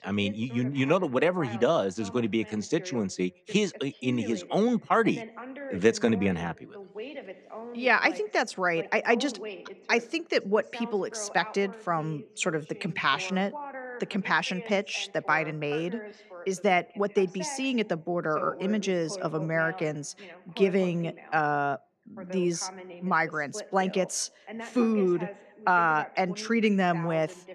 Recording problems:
voice in the background; noticeable; throughout; 15 dB below the speech

